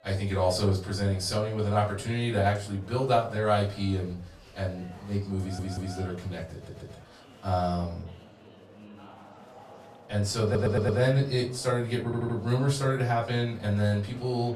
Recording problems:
off-mic speech; far
room echo; slight; dies away in 0.3 s
chatter from many people; faint; throughout; 20 dB below the speech
audio stuttering; 4 times, first at 5.5 s

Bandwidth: 14.5 kHz